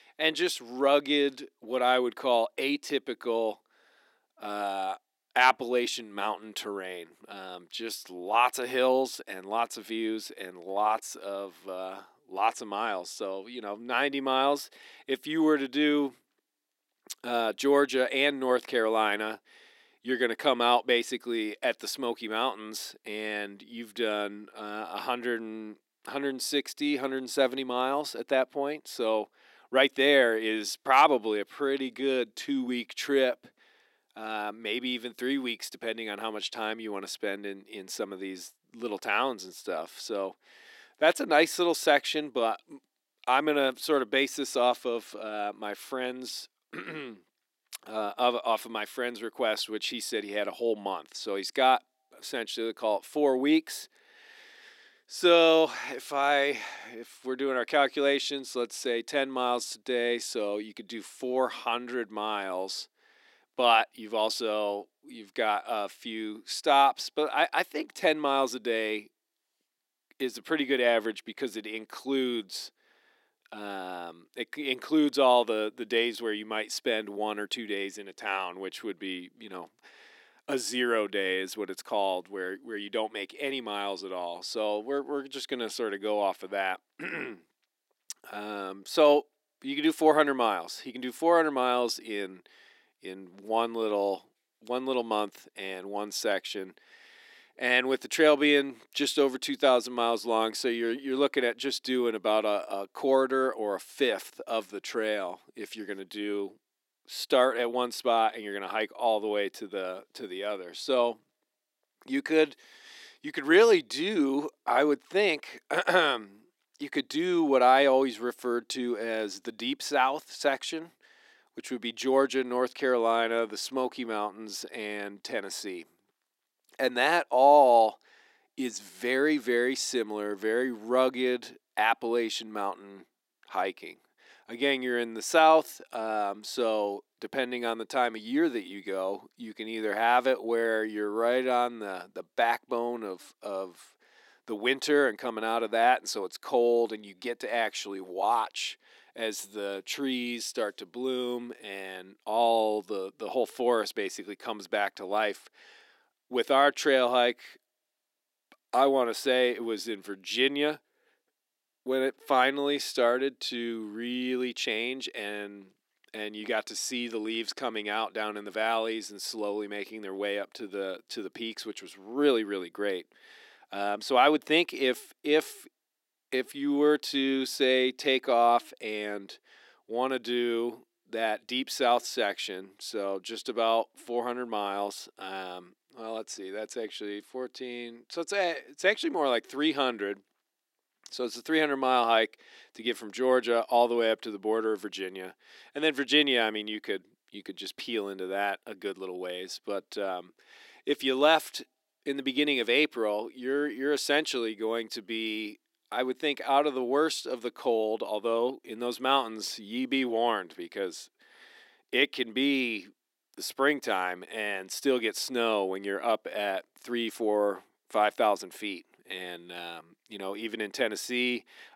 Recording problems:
thin; very slightly; fading below 300 Hz

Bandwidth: 16 kHz